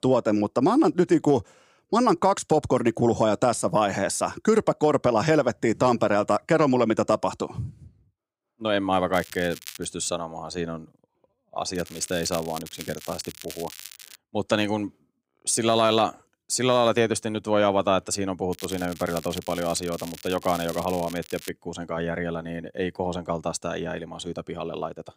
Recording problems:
crackling; noticeable; at 9 s, from 12 to 14 s and from 19 to 21 s; 15 dB below the speech

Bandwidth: 15.5 kHz